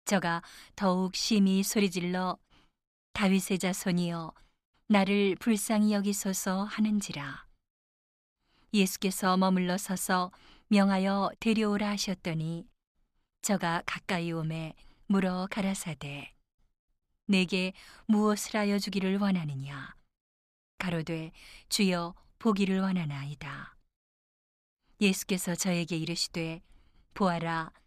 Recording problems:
none

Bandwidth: 14.5 kHz